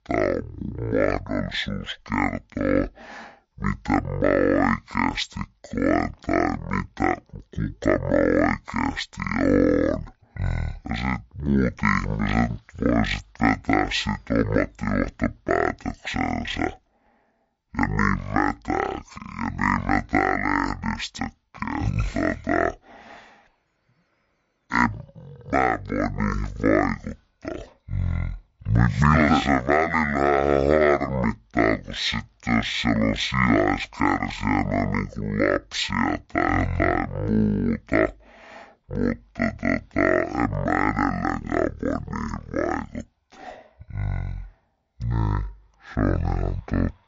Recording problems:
wrong speed and pitch; too slow and too low; 0.5 times normal speed

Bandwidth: 7.5 kHz